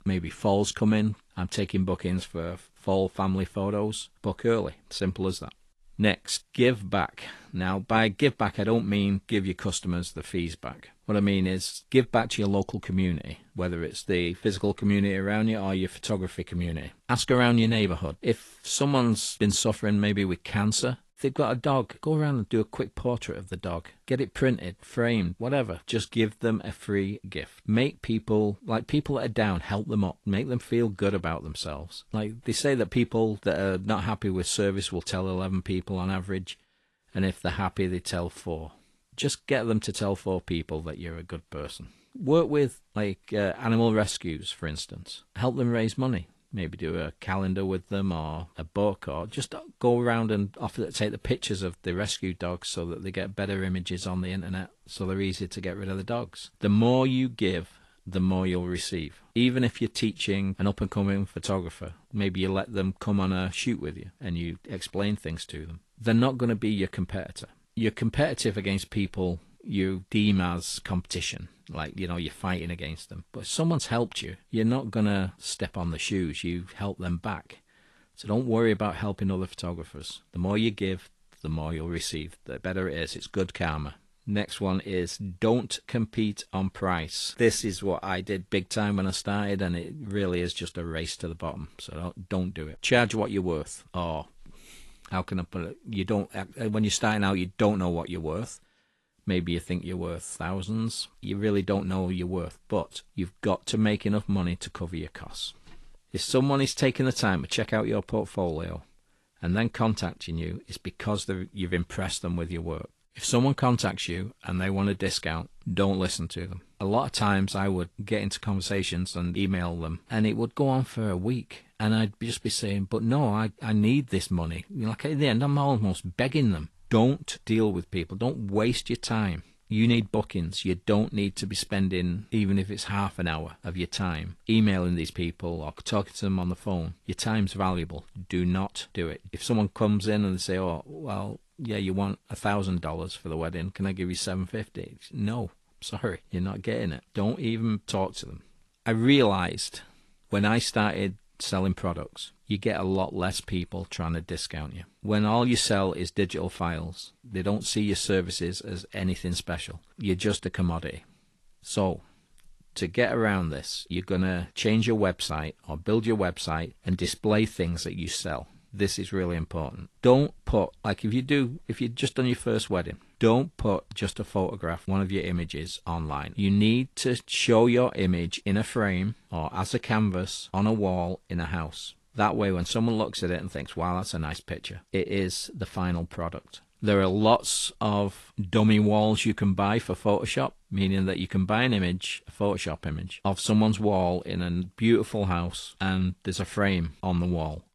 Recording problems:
garbled, watery; slightly; nothing above 11 kHz

